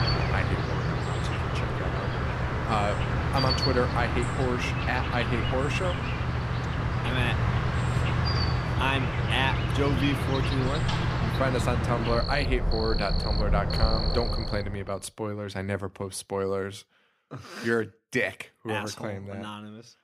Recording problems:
animal sounds; very loud; until 15 s; 3 dB above the speech

